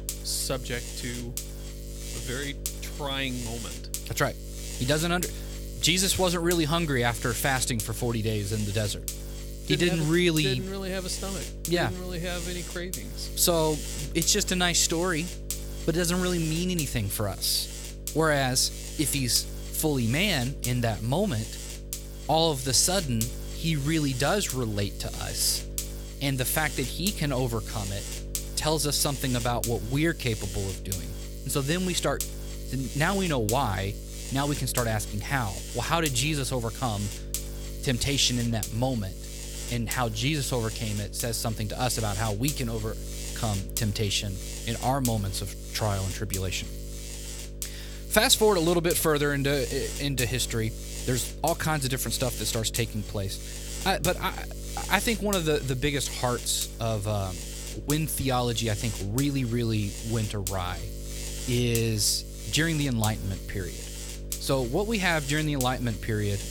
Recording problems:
electrical hum; noticeable; throughout; 50 Hz, 10 dB below the speech

